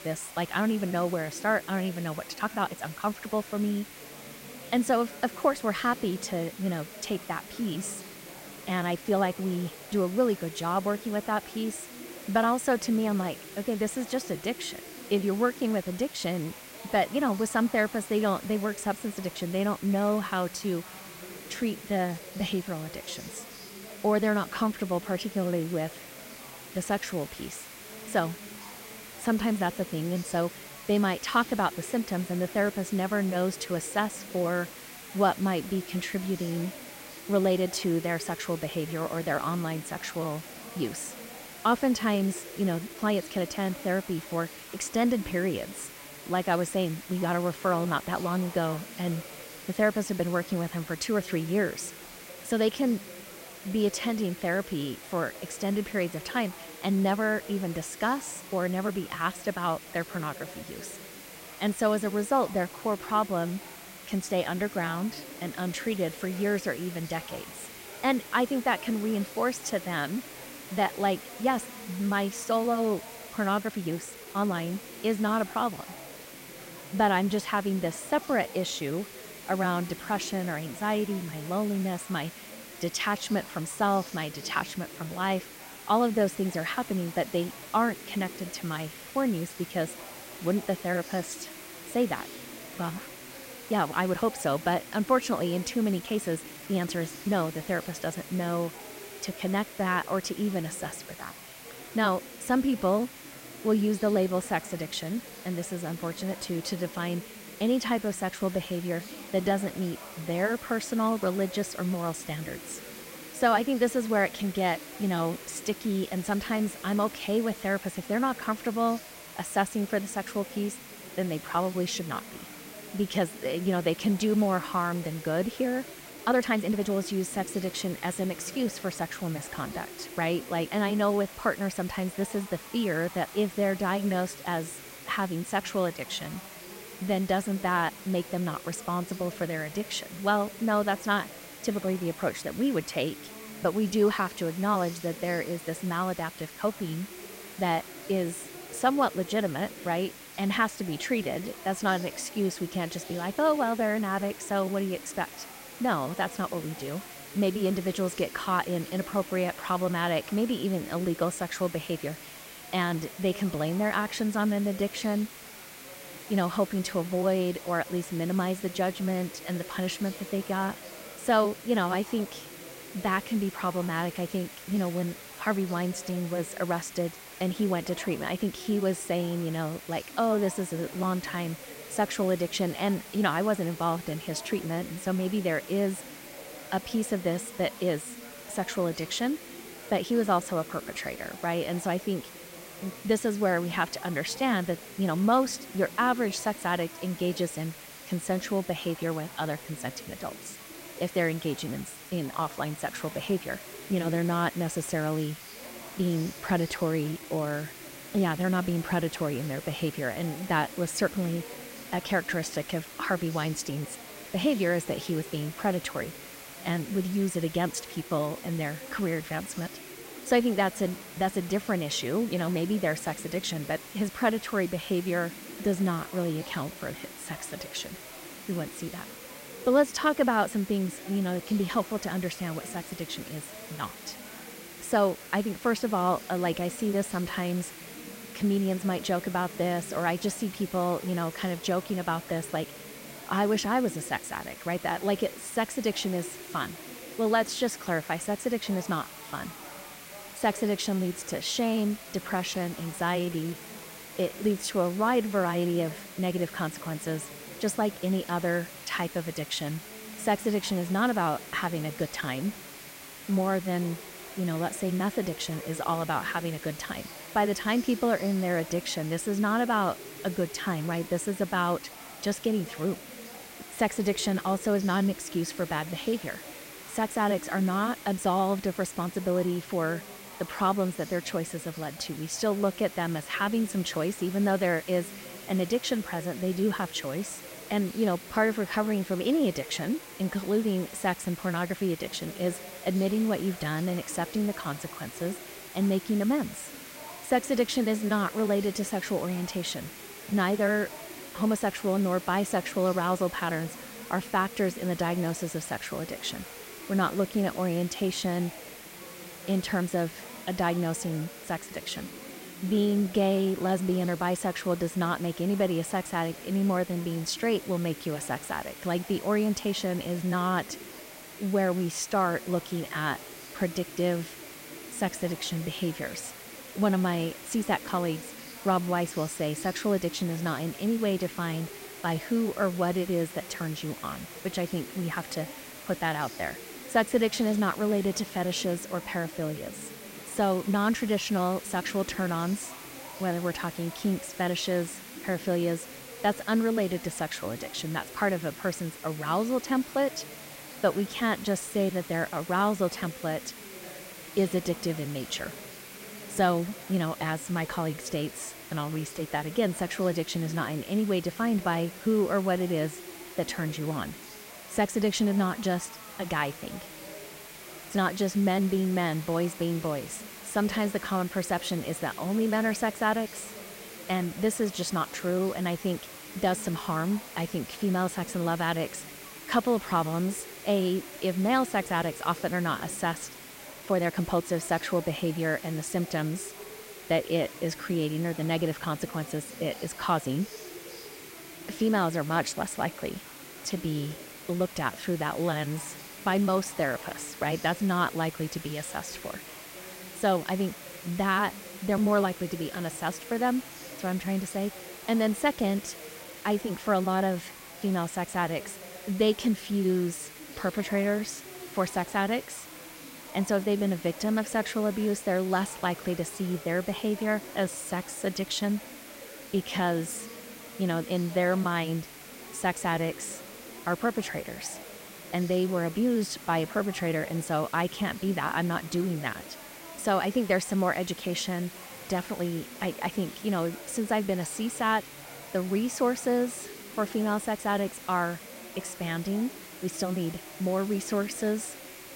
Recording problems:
background chatter; noticeable; throughout; 4 voices, 20 dB below the speech
hiss; noticeable; throughout; 15 dB below the speech
uneven, jittery; strongly; from 2.5 s to 6:54

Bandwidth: 16 kHz